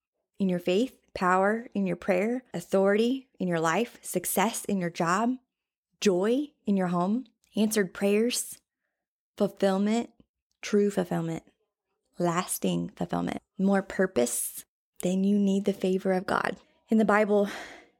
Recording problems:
none

